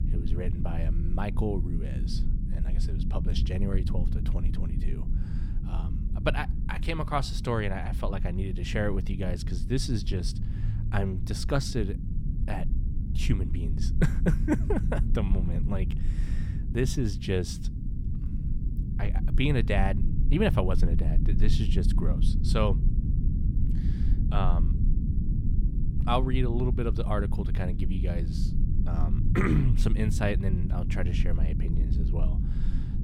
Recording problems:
low rumble; loud; throughout; 9 dB below the speech

